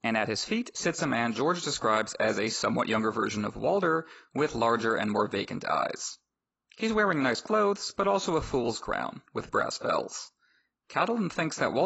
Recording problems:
garbled, watery; badly; nothing above 7.5 kHz
abrupt cut into speech; at the end

